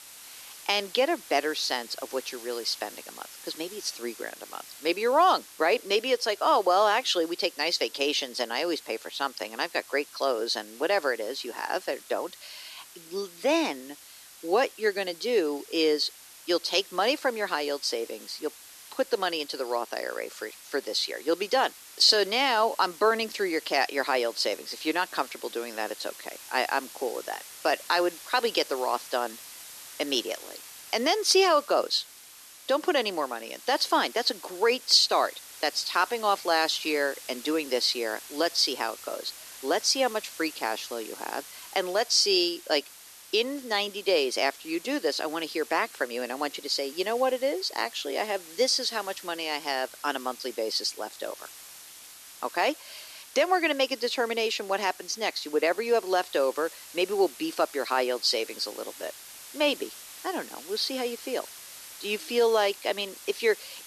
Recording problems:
thin; somewhat; fading below 300 Hz
hiss; noticeable; throughout; 15 dB below the speech

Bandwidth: 13.5 kHz